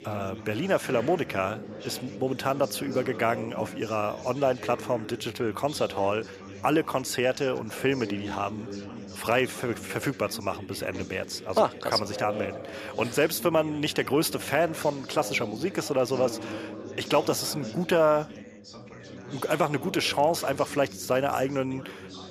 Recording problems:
background chatter; noticeable; throughout; 4 voices, 15 dB below the speech

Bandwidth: 14.5 kHz